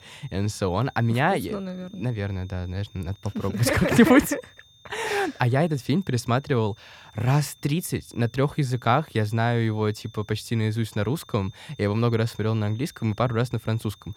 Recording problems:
high-pitched whine; faint; throughout; 3.5 kHz, 30 dB below the speech

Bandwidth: 18.5 kHz